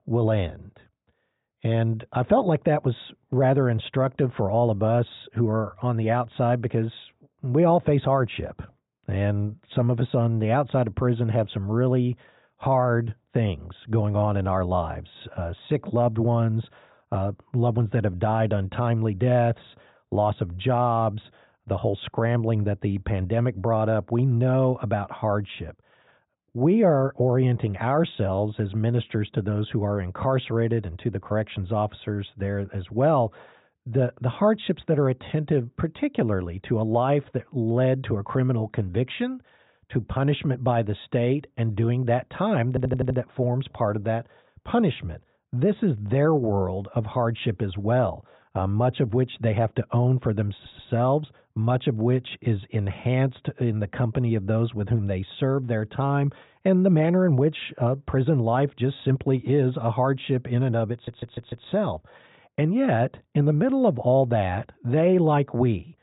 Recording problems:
high frequencies cut off; severe; nothing above 4 kHz
muffled; very slightly; fading above 3 kHz
audio stuttering; at 43 s, at 51 s and at 1:01

